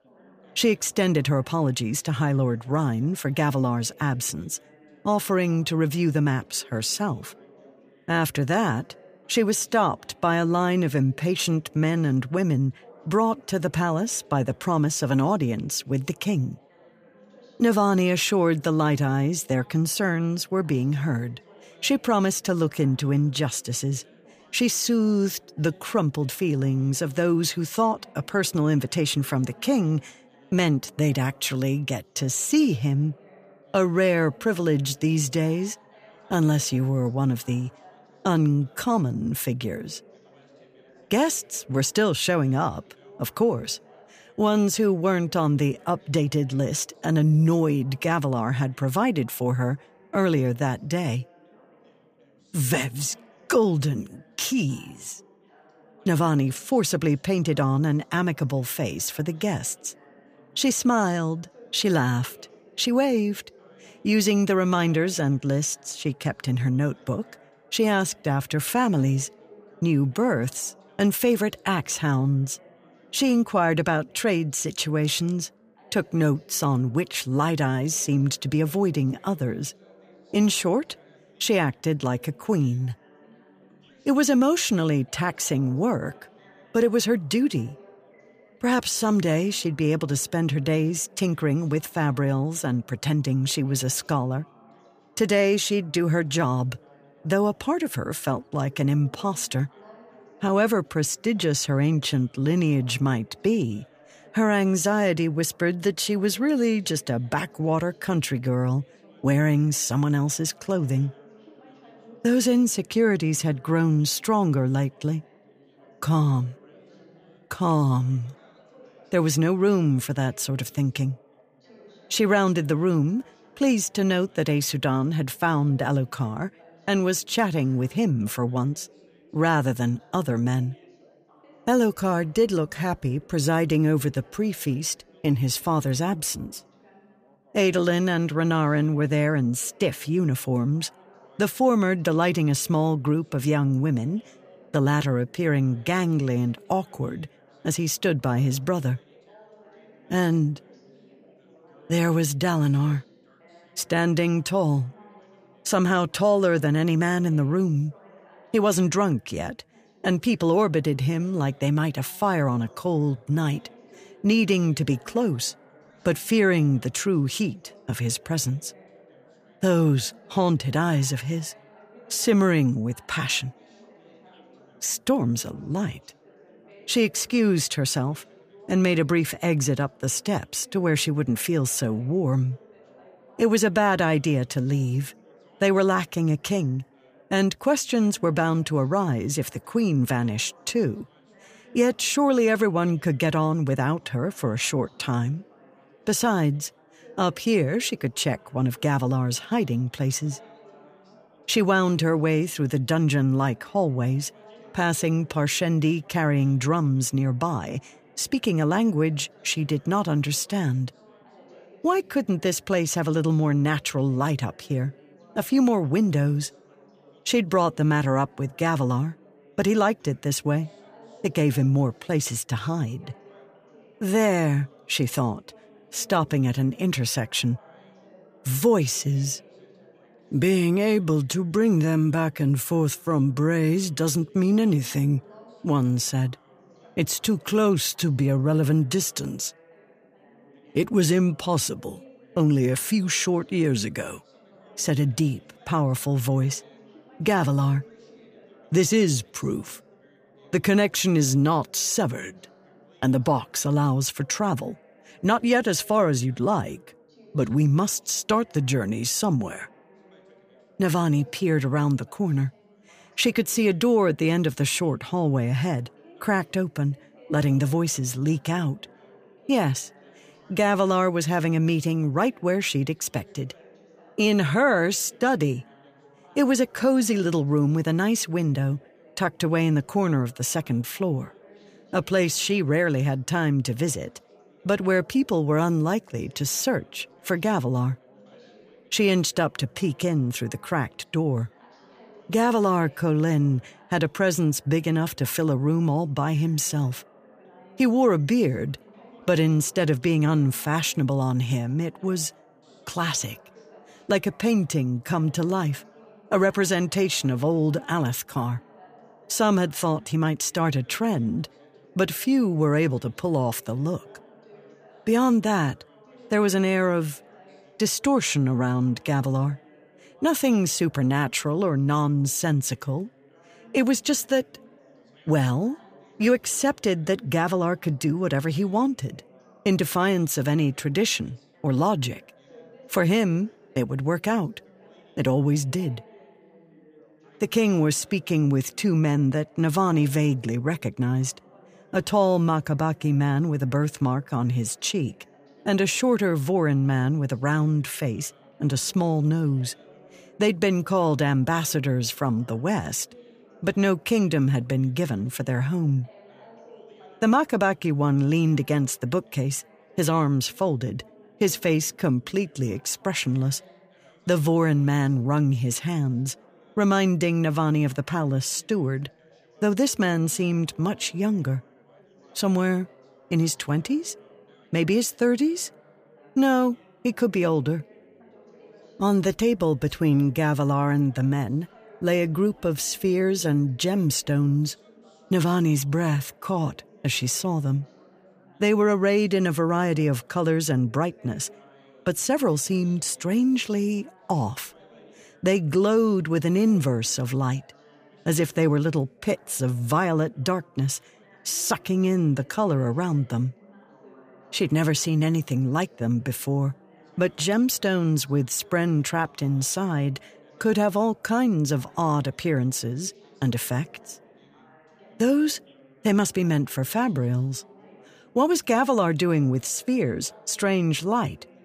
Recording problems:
background chatter; faint; throughout; 4 voices, 30 dB below the speech

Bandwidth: 15 kHz